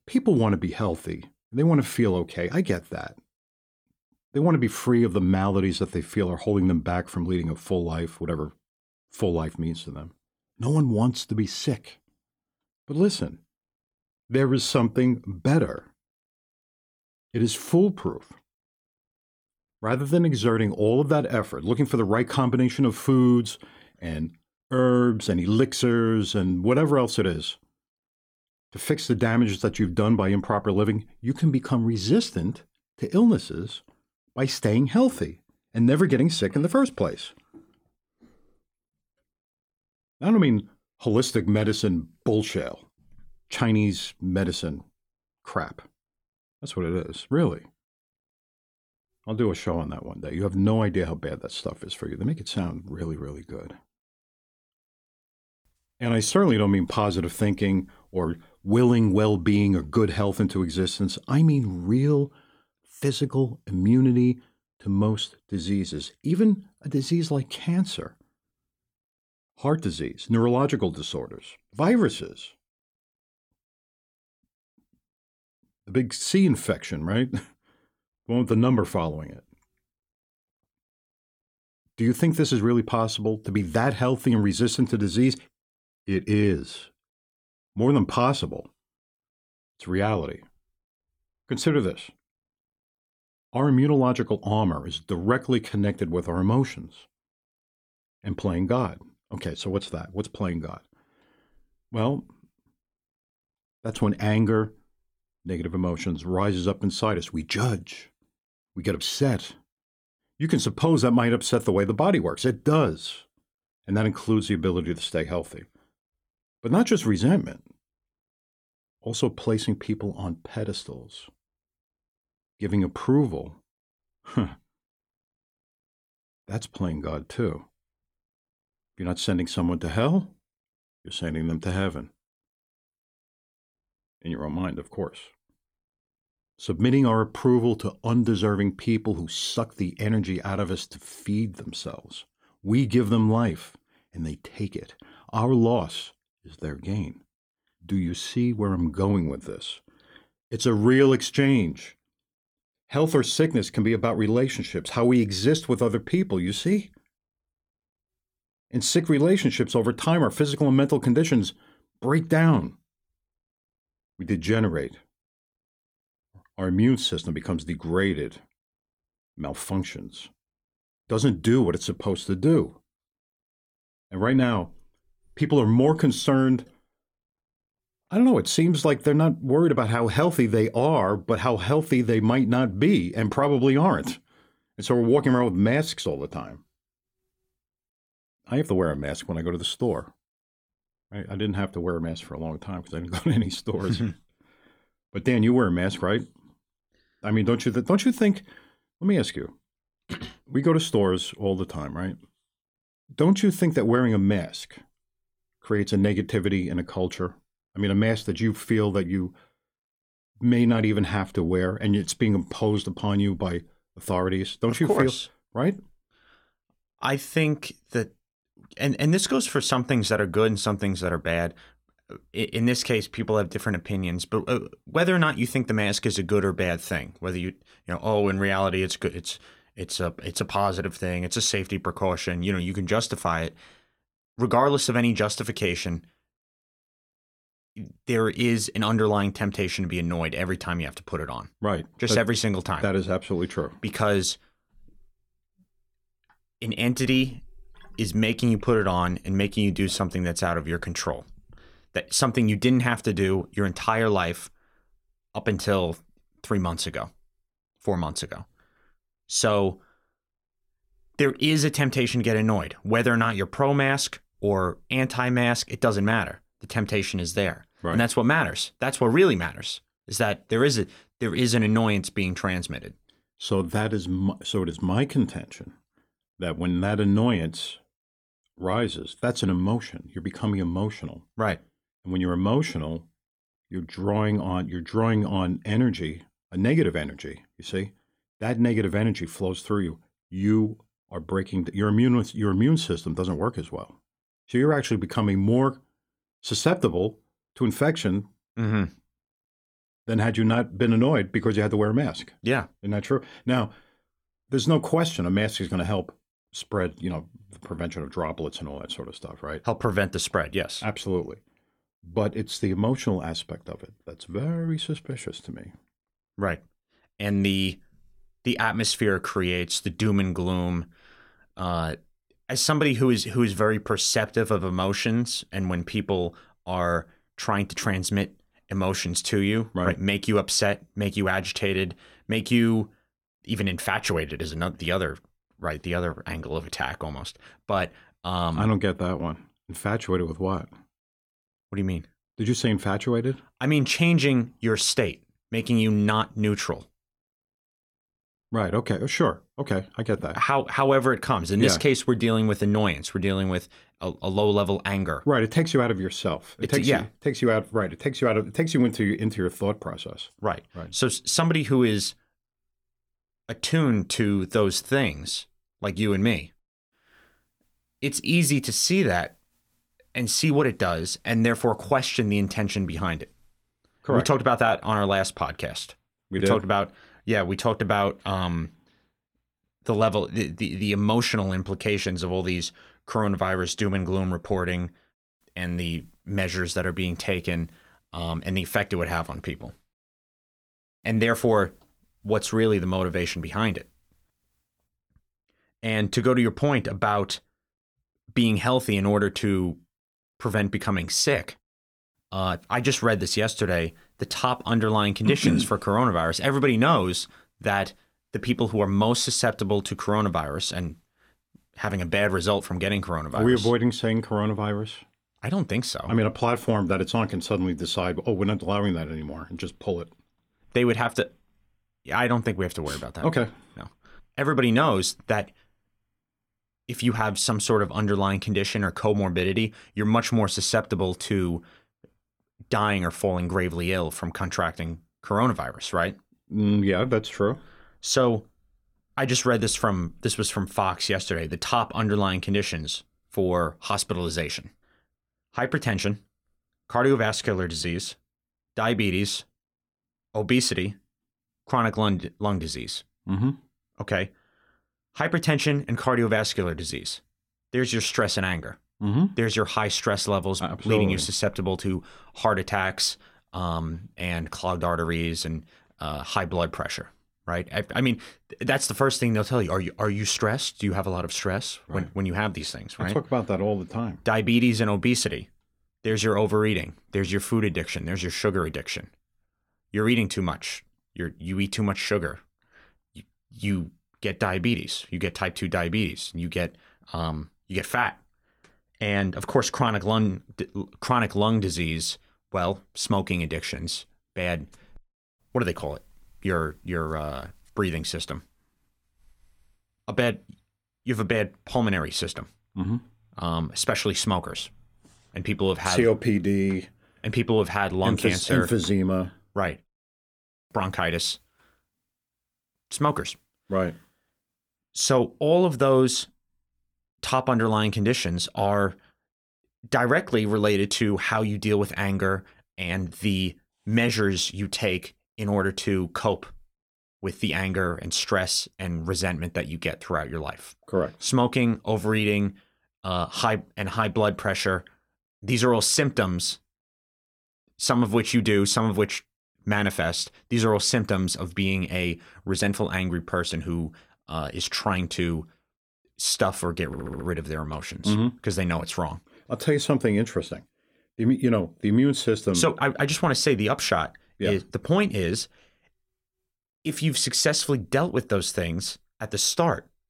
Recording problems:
audio stuttering; at 9:07

